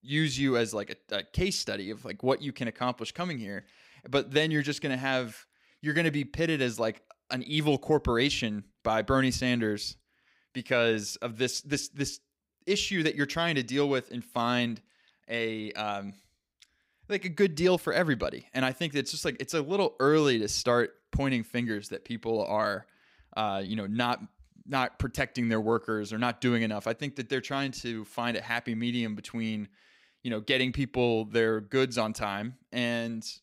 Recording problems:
none

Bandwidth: 15.5 kHz